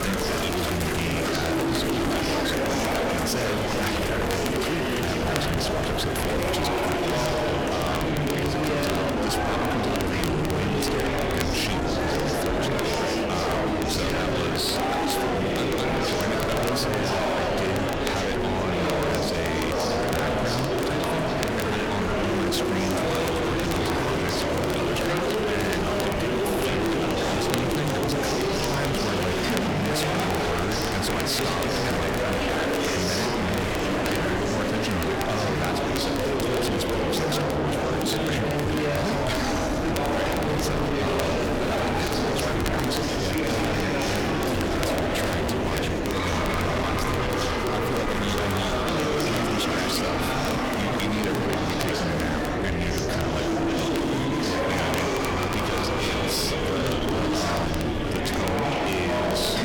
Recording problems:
distortion; heavy; 45% of the sound clipped
murmuring crowd; very loud; throughout; 4 dB above the speech
wind noise on the microphone; heavy; 10 dB below the speech
crackle, like an old record; noticeable; 10 dB below the speech

